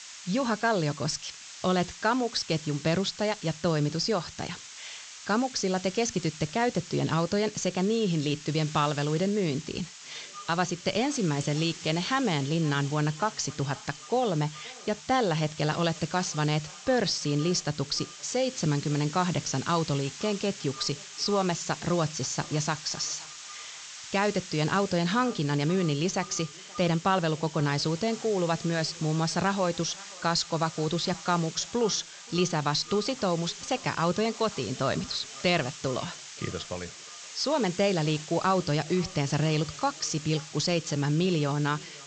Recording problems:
high frequencies cut off; noticeable; nothing above 8 kHz
echo of what is said; faint; from 10 s on; 530 ms later, 20 dB below the speech
hiss; noticeable; throughout; 15 dB below the speech

